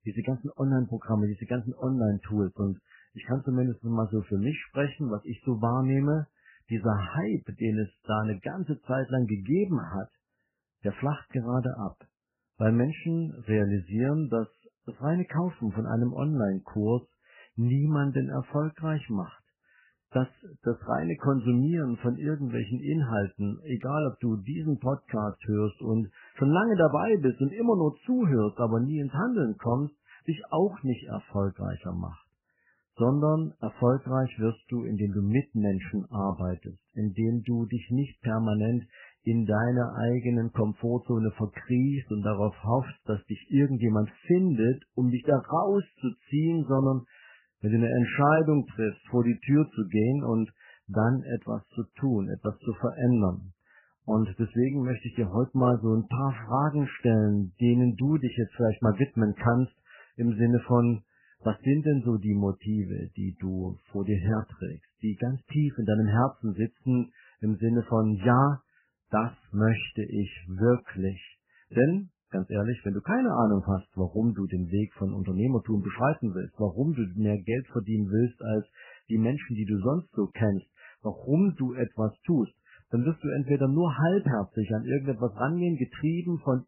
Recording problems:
garbled, watery; badly; nothing above 3 kHz

